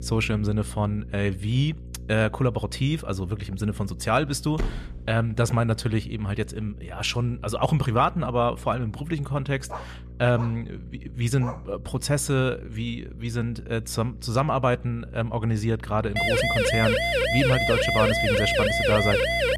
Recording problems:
electrical hum; faint; throughout; 60 Hz, 25 dB below the speech
door banging; noticeable; at 4.5 s; peak 7 dB below the speech
dog barking; faint; from 9.5 to 12 s; peak 15 dB below the speech
siren; loud; from 16 s on; peak 4 dB above the speech

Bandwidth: 13.5 kHz